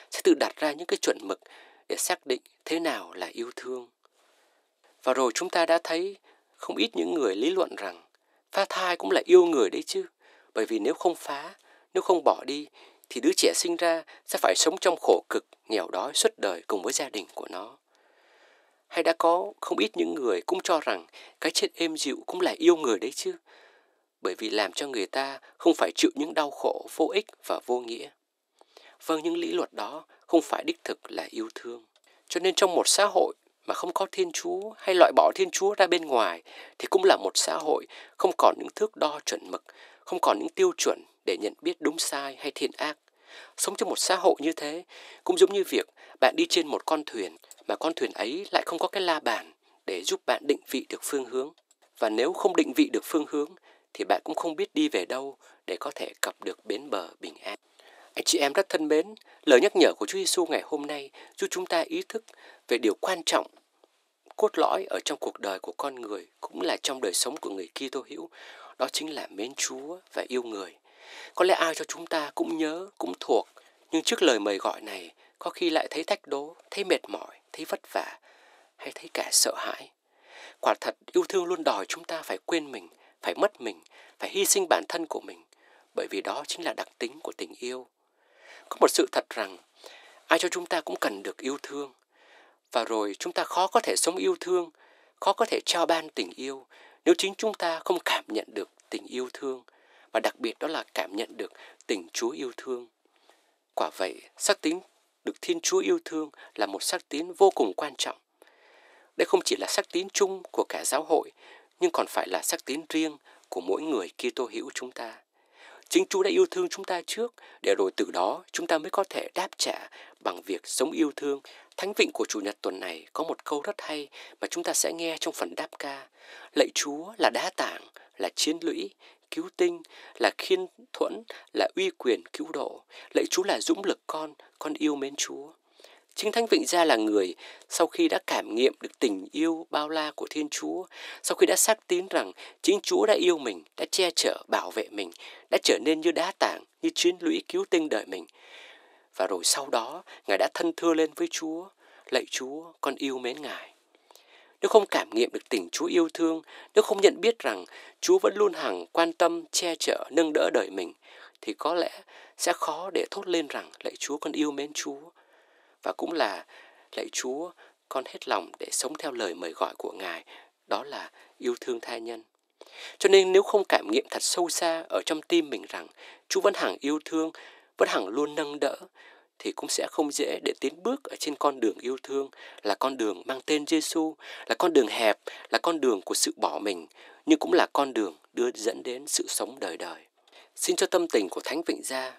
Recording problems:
thin; very; fading below 300 Hz

